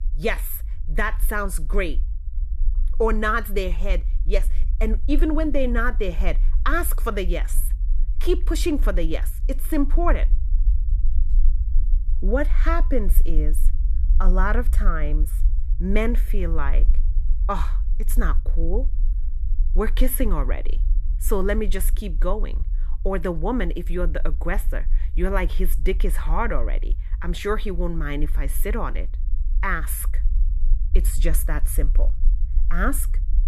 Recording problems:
low rumble; faint; throughout; 20 dB below the speech

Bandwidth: 13.5 kHz